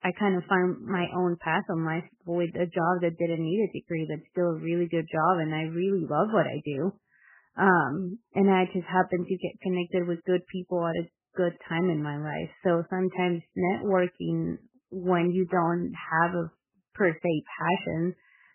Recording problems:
garbled, watery; badly; nothing above 3 kHz

